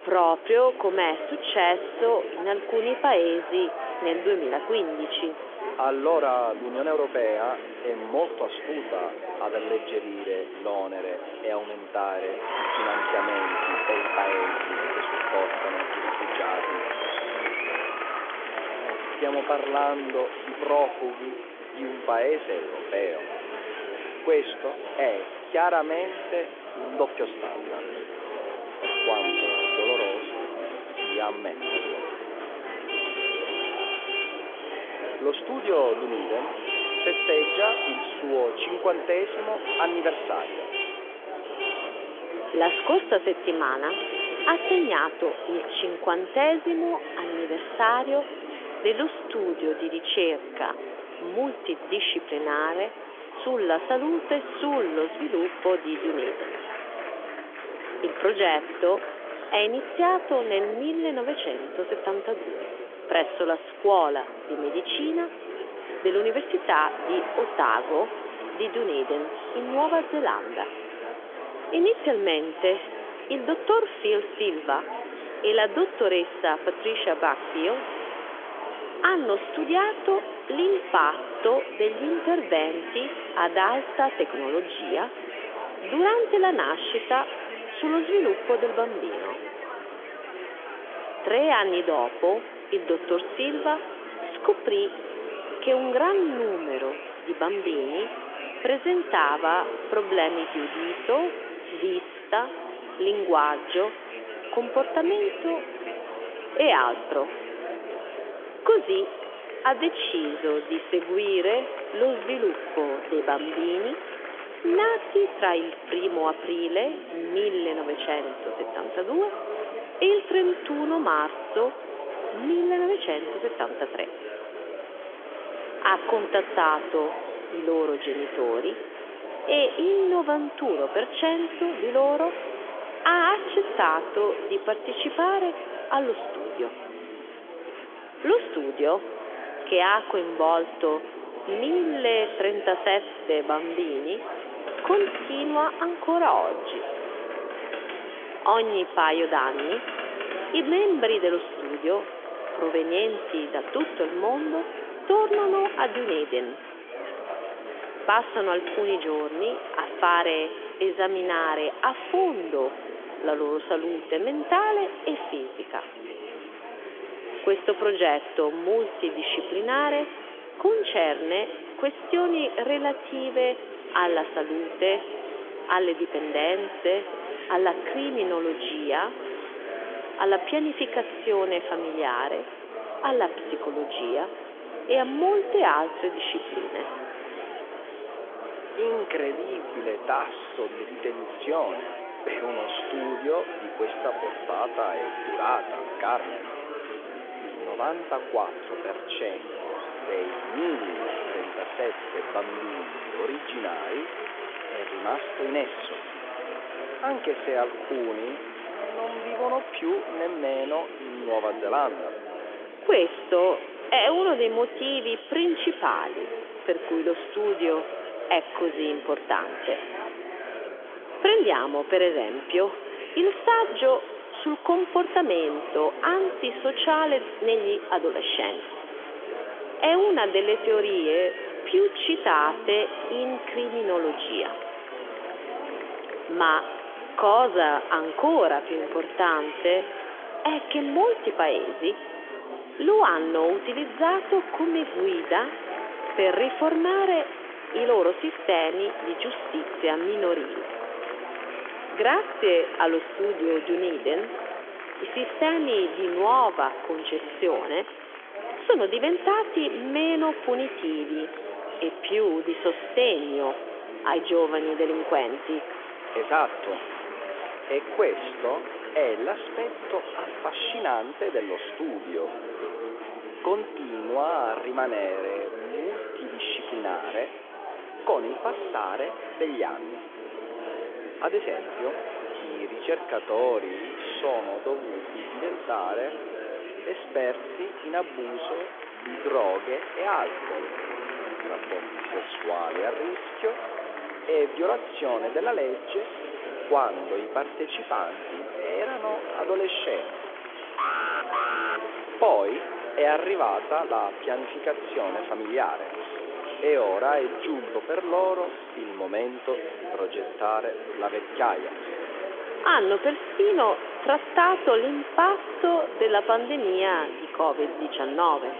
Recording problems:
echo of what is said; faint; from 1:18 on; 100 ms later, 20 dB below the speech
phone-call audio; nothing above 3.5 kHz
traffic noise; loud; throughout; 9 dB below the speech
murmuring crowd; loud; throughout; 9 dB below the speech
alarm; loud; at 5:01; peak level with the speech

